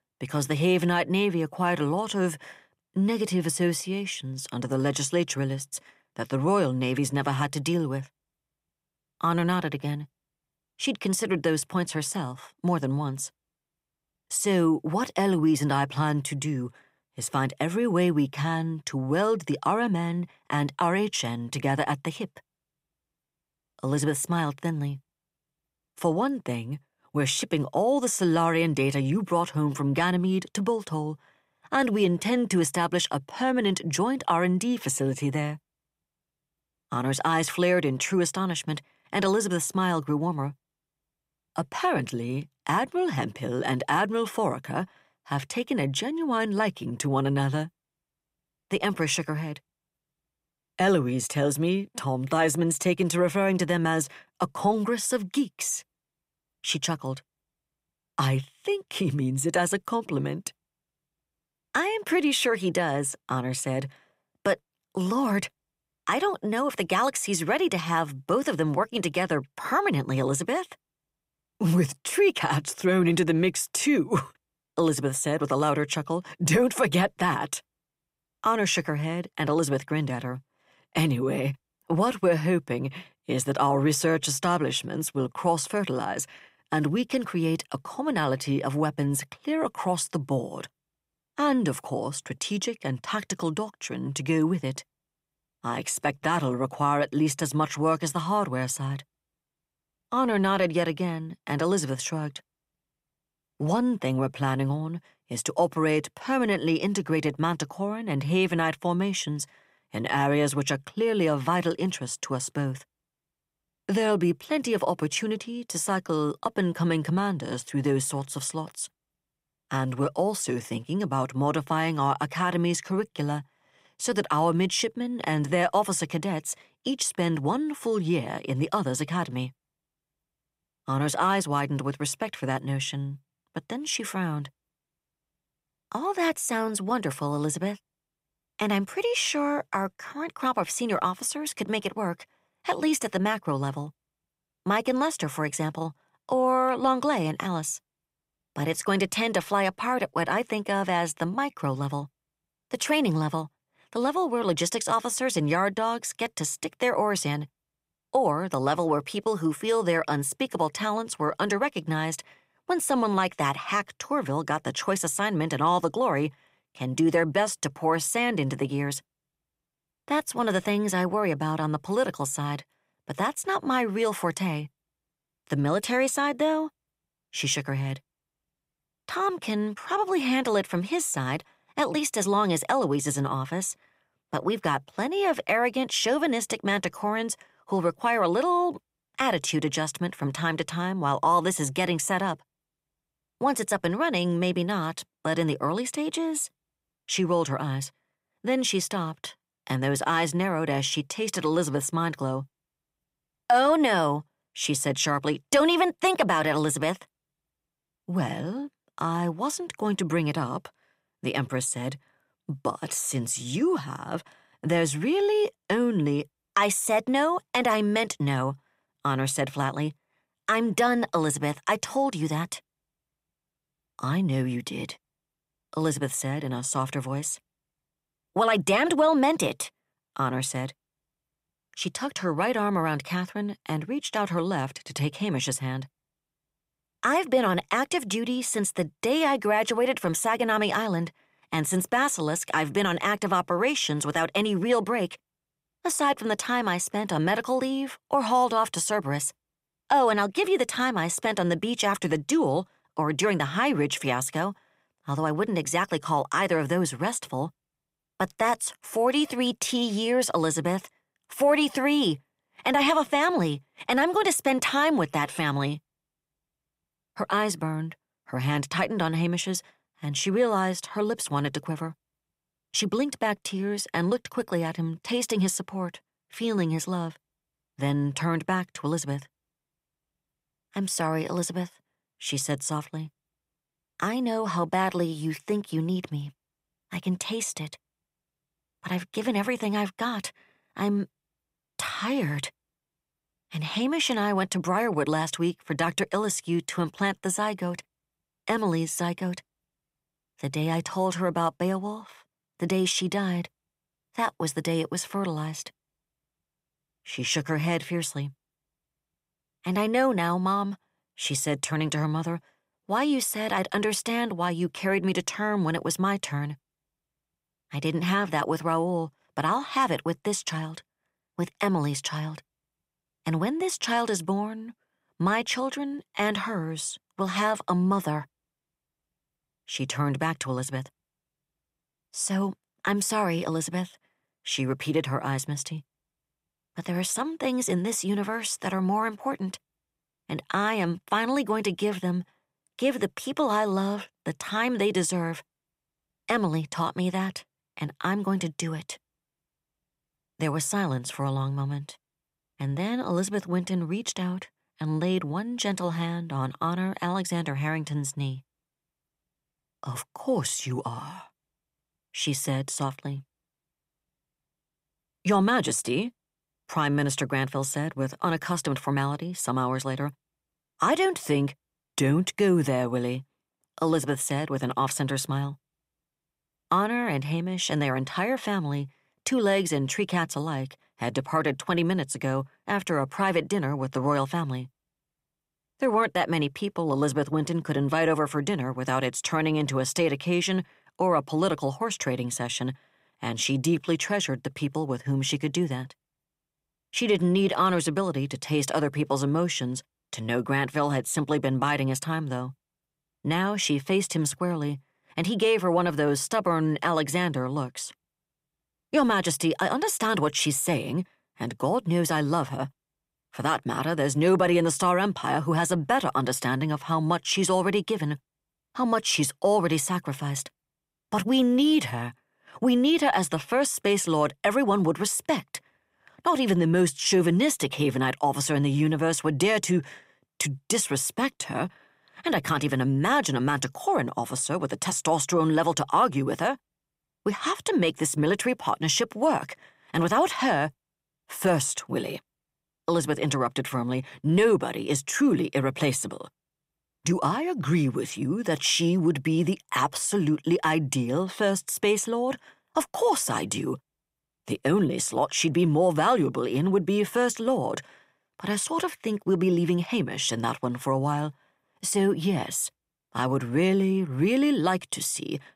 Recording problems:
none

